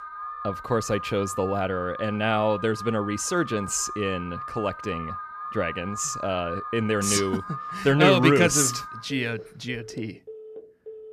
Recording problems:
alarms or sirens; noticeable; throughout; 10 dB below the speech

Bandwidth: 14.5 kHz